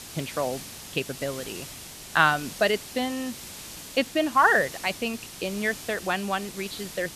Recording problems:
high frequencies cut off; severe; nothing above 4.5 kHz
hiss; noticeable; throughout; 10 dB below the speech

